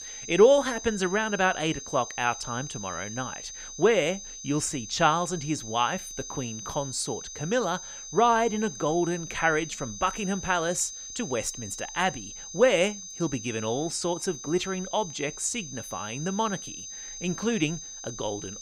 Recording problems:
high-pitched whine; noticeable; throughout; 6.5 kHz, 10 dB below the speech

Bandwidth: 15.5 kHz